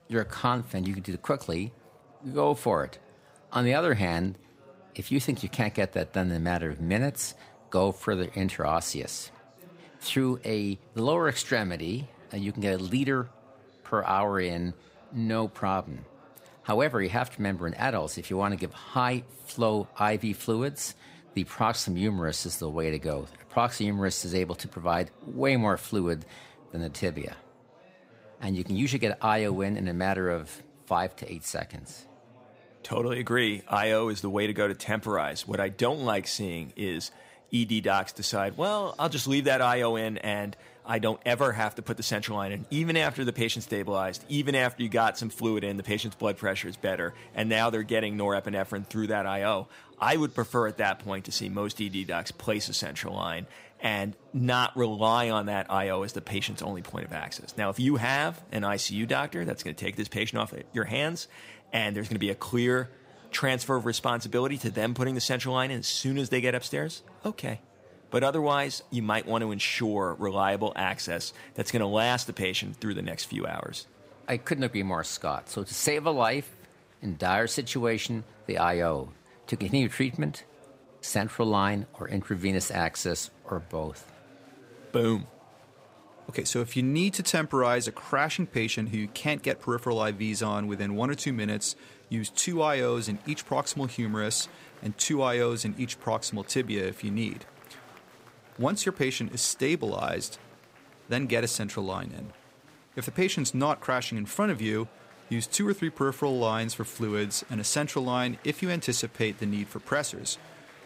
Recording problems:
murmuring crowd; faint; throughout; 25 dB below the speech

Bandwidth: 15.5 kHz